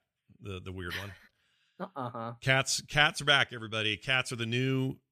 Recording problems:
none

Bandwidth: 14.5 kHz